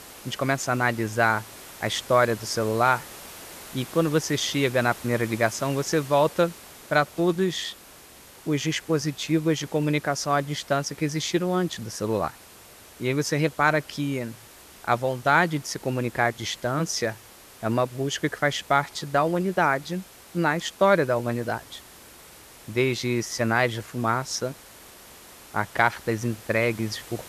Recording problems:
hiss; noticeable; throughout; 20 dB below the speech

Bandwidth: 14 kHz